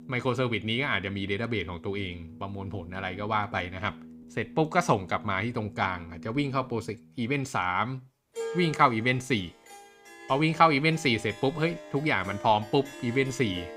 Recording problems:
background music; noticeable; throughout; 15 dB below the speech

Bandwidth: 15.5 kHz